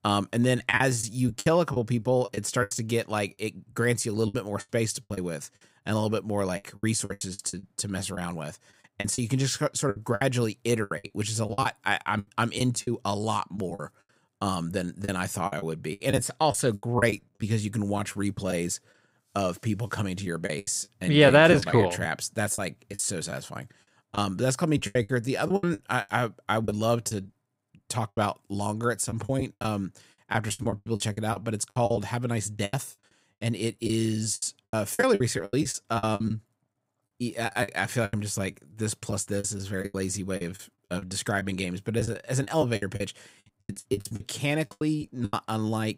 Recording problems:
choppy; very; 14% of the speech affected

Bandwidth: 15.5 kHz